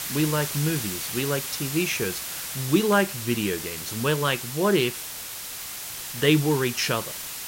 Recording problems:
hiss; loud; throughout; 6 dB below the speech

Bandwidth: 16 kHz